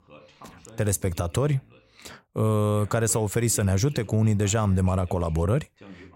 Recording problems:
voice in the background; faint; throughout; 25 dB below the speech

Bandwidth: 16 kHz